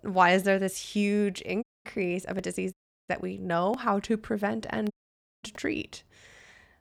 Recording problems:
audio cutting out; at 1.5 s, at 2.5 s and at 5 s for 0.5 s

